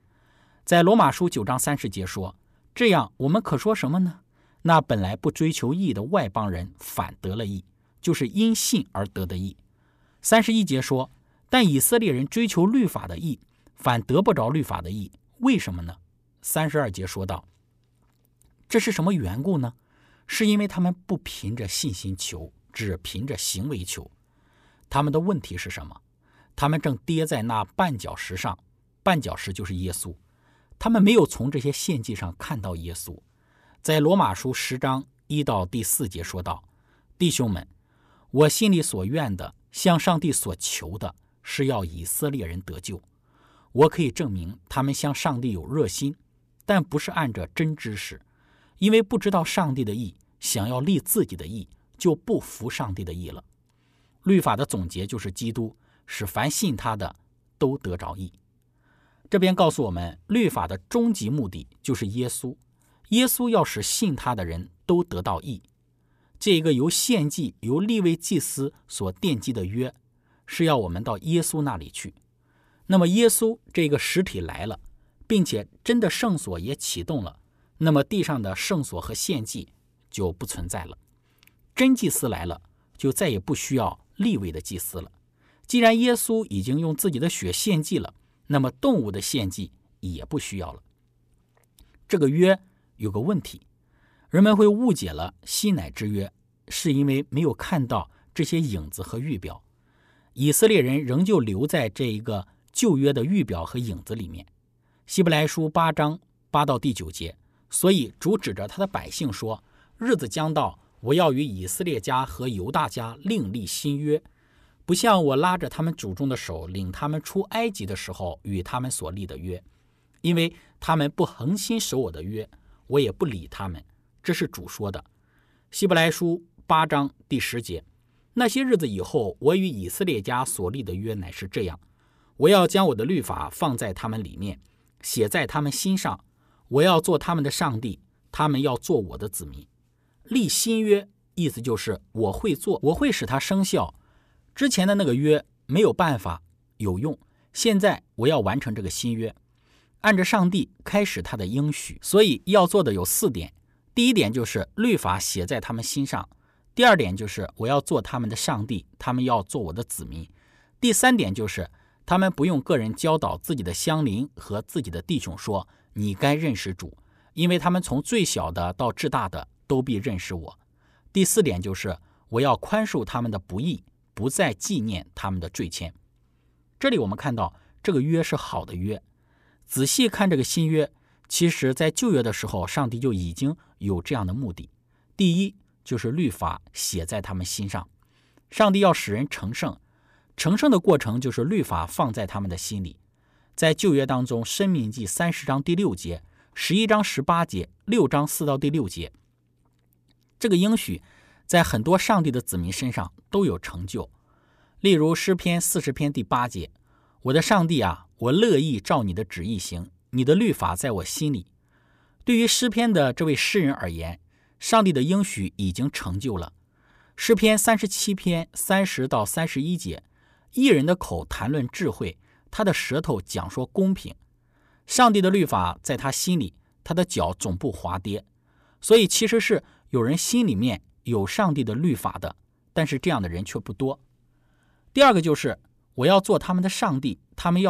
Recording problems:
abrupt cut into speech; at the end

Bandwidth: 14.5 kHz